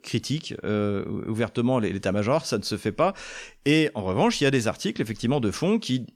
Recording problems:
none

